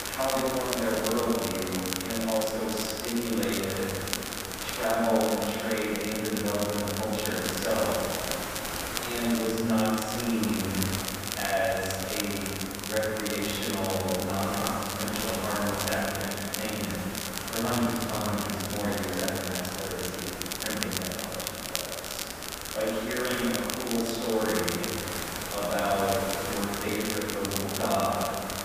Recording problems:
room echo; strong; dies away in 2.2 s
off-mic speech; far
hiss; loud; throughout; 6 dB below the speech
crackle, like an old record; loud; 5 dB below the speech

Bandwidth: 15 kHz